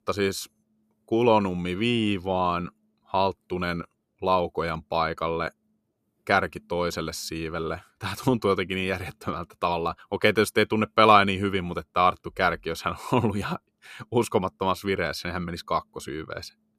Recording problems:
none

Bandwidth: 14.5 kHz